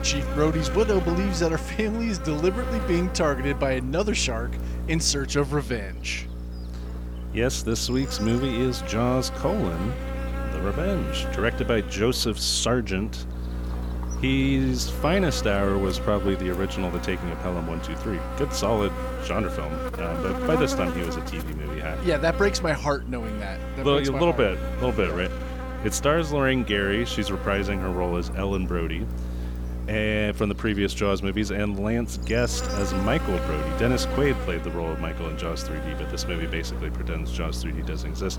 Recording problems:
electrical hum; loud; throughout; 60 Hz, 8 dB below the speech

